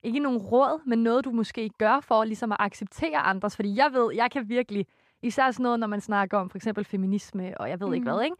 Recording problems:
none

